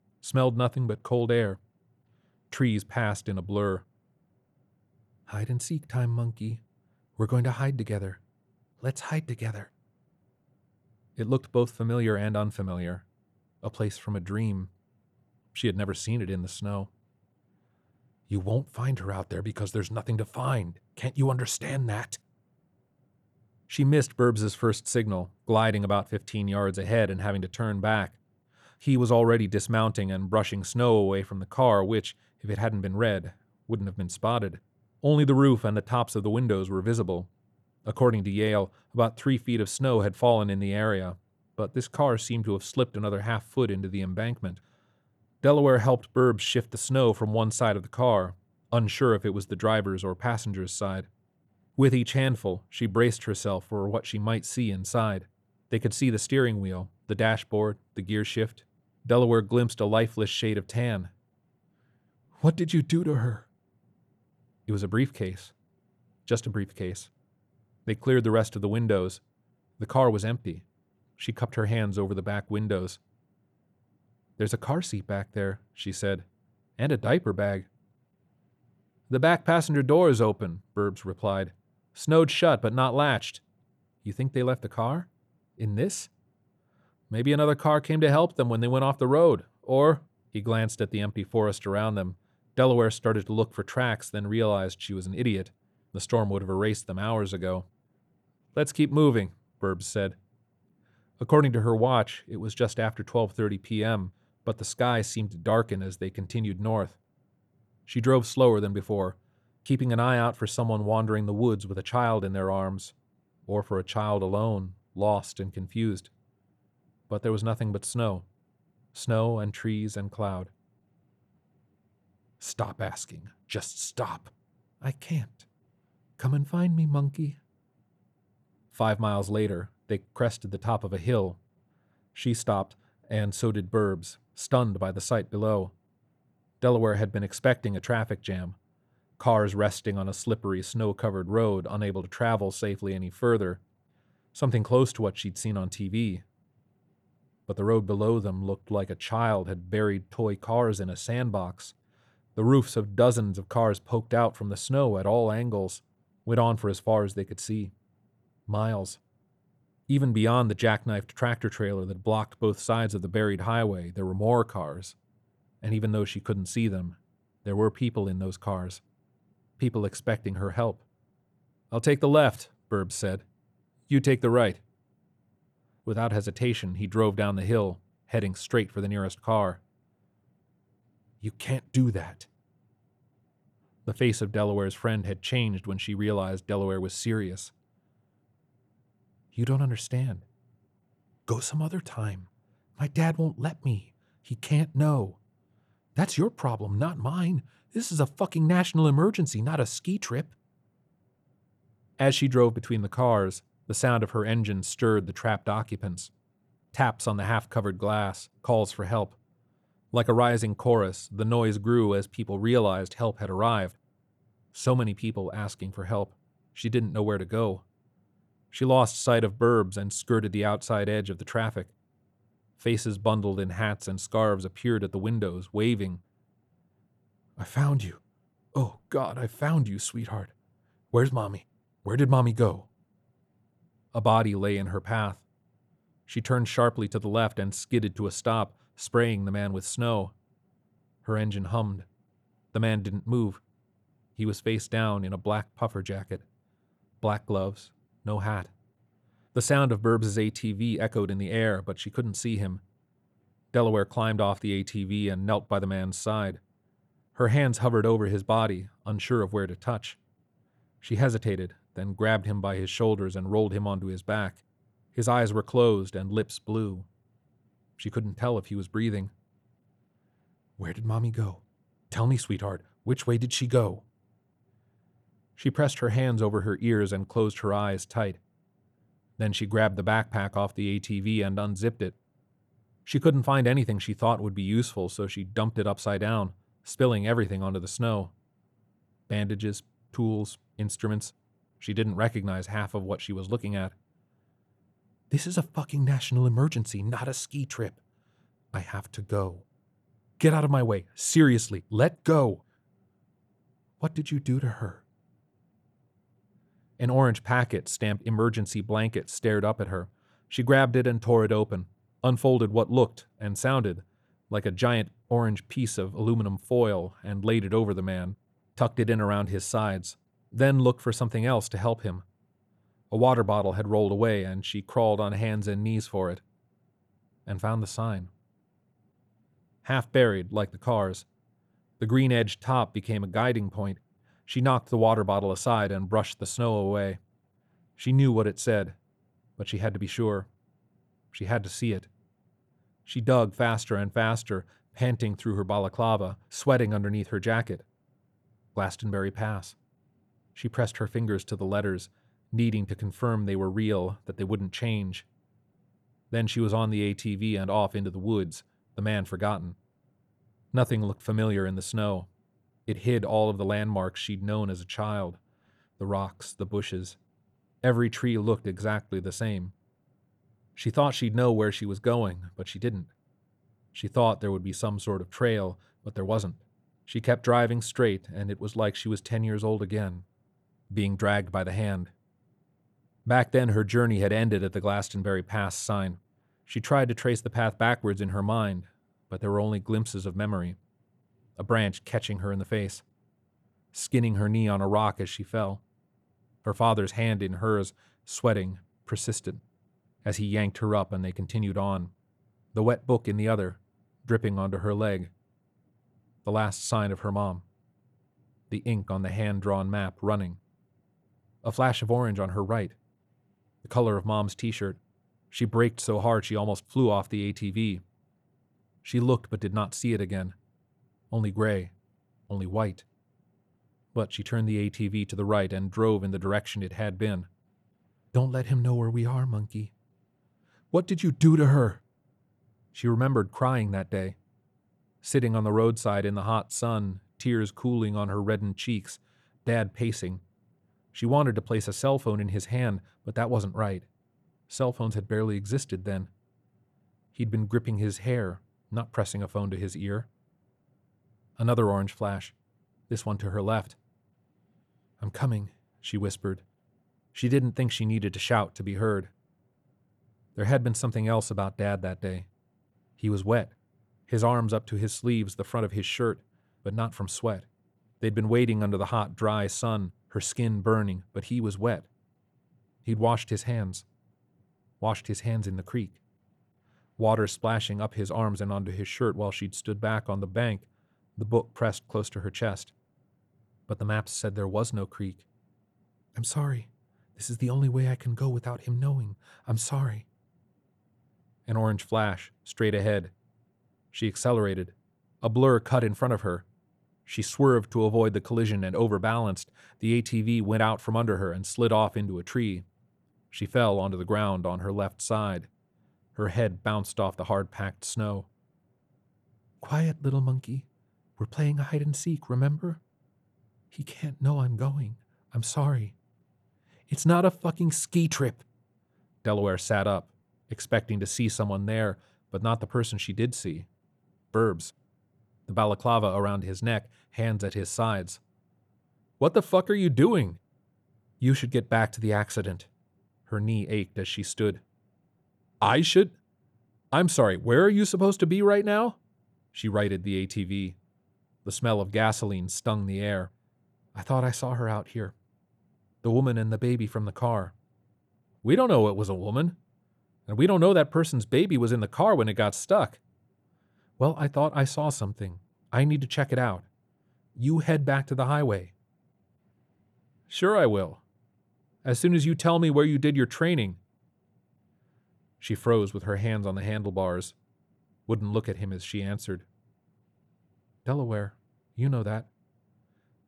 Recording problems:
none

